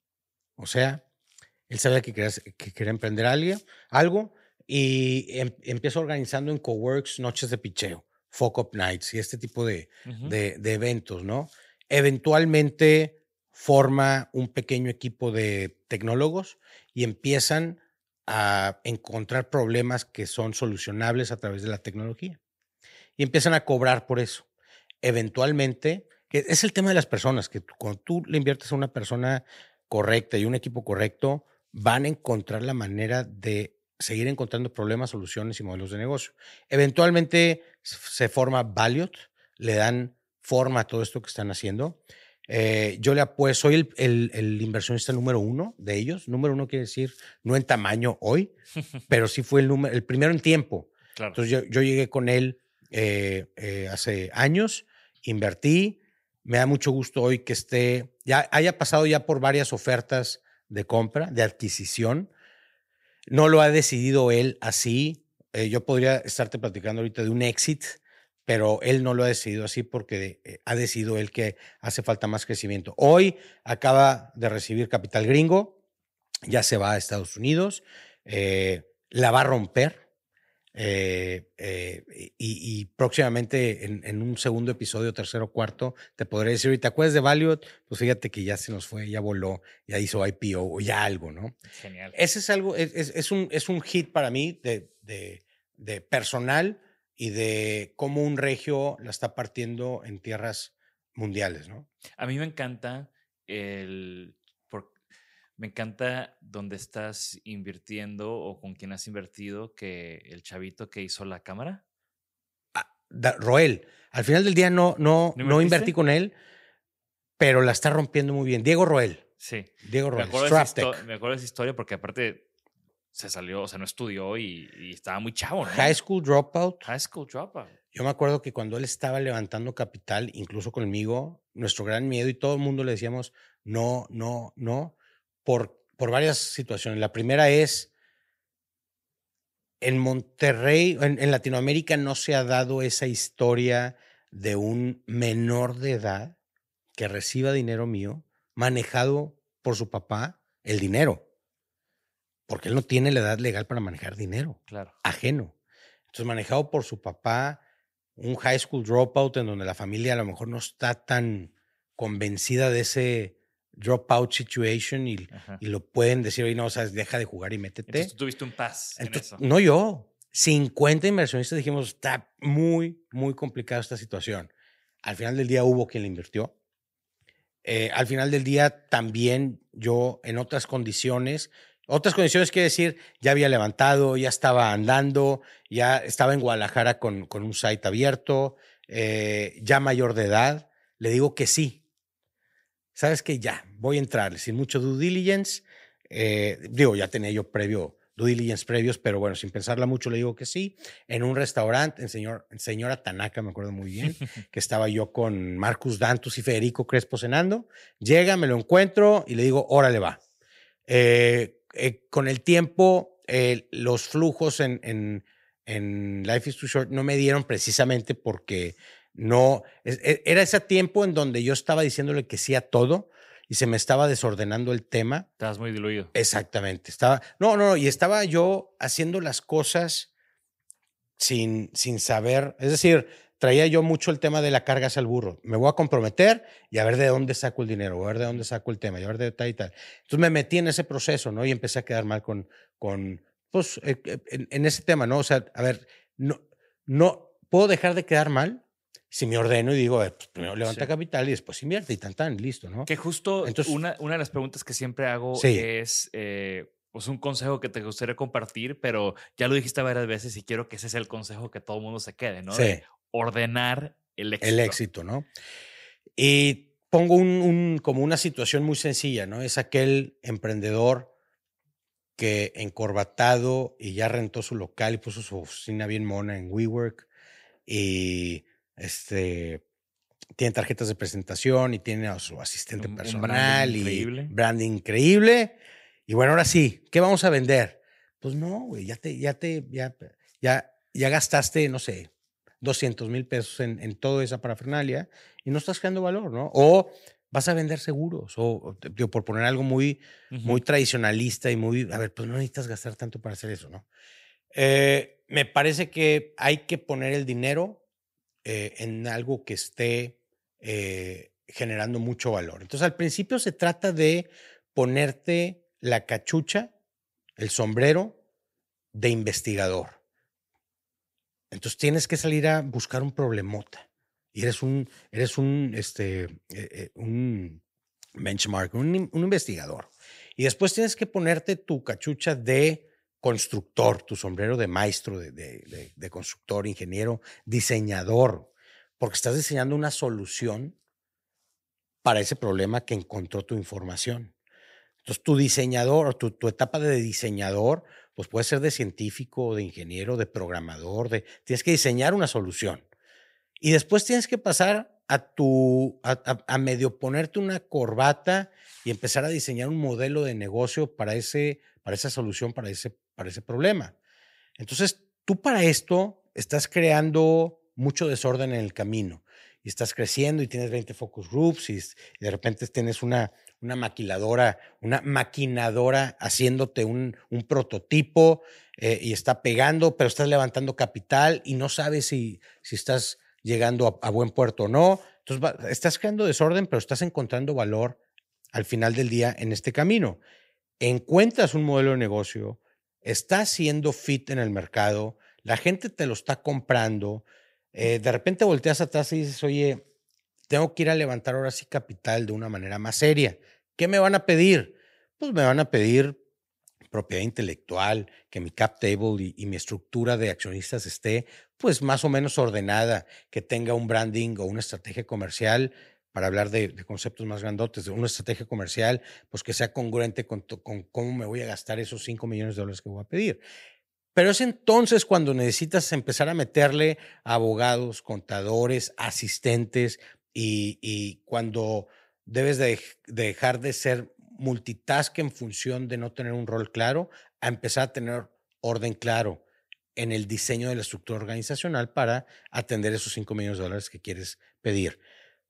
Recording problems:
none

